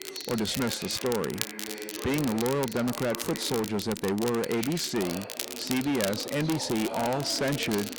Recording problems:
distortion; heavy; 16% of the sound clipped
crackle, like an old record; loud; 8 dB below the speech
household noises; noticeable; throughout; 20 dB below the speech
voice in the background; noticeable; throughout; 10 dB below the speech

